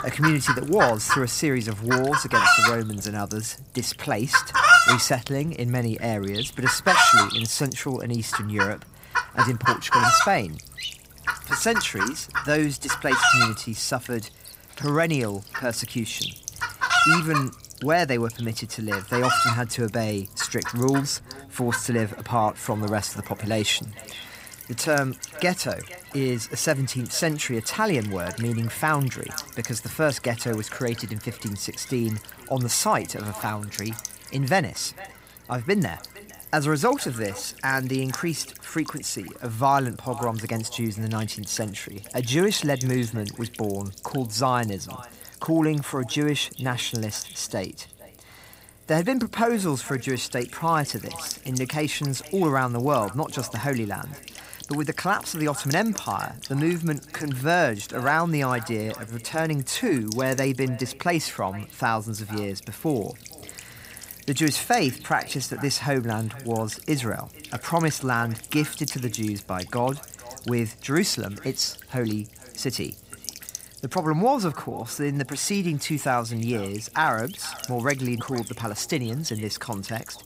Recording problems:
echo of what is said; faint; from 21 s on; 460 ms later, 20 dB below the speech
animal sounds; very loud; throughout; 4 dB above the speech
electrical hum; noticeable; throughout; 60 Hz, 15 dB below the speech

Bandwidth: 15.5 kHz